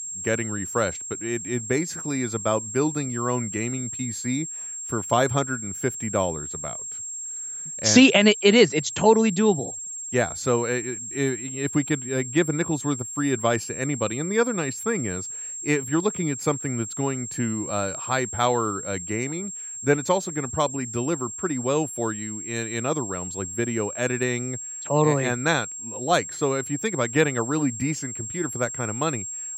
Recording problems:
high-pitched whine; loud; throughout; 7.5 kHz, 7 dB below the speech

